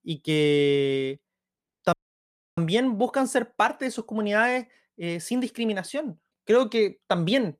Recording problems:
audio cutting out; at 2 s for 0.5 s

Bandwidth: 14.5 kHz